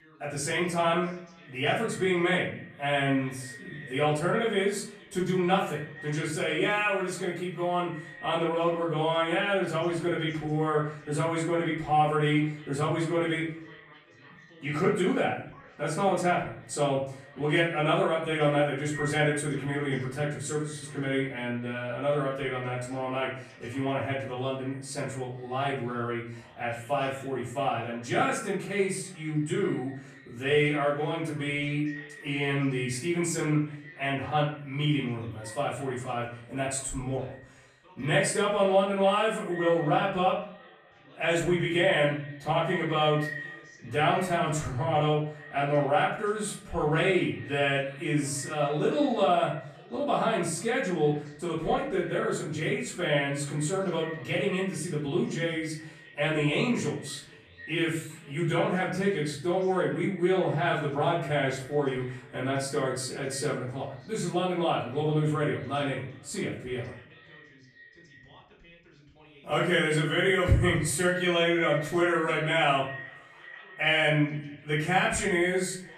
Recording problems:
off-mic speech; far
room echo; noticeable; dies away in 0.5 s
echo of what is said; faint; throughout; 460 ms later, 20 dB below the speech
voice in the background; faint; throughout; 25 dB below the speech

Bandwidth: 14.5 kHz